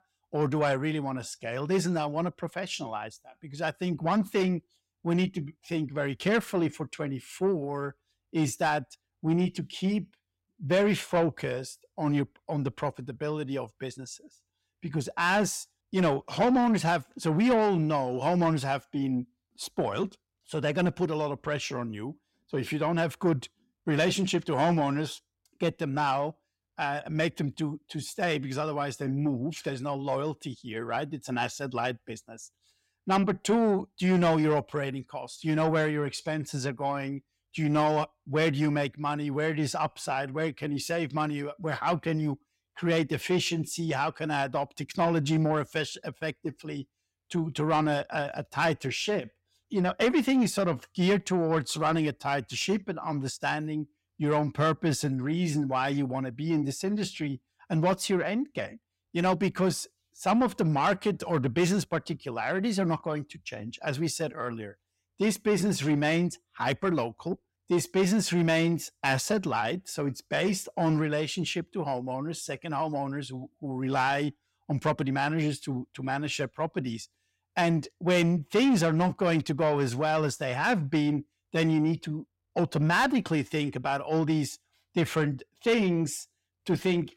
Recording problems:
distortion; slight; 10 dB below the speech

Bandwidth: 16 kHz